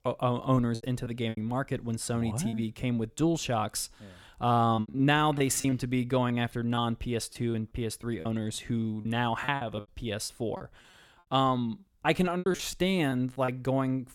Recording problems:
choppy; very; 9% of the speech affected

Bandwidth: 17 kHz